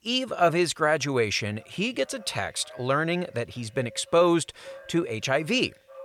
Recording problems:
echo of what is said; faint; throughout; 580 ms later, 25 dB below the speech

